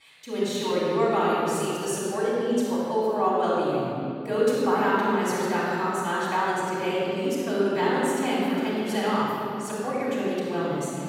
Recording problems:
room echo; strong; dies away in 2.8 s
off-mic speech; far

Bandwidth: 16.5 kHz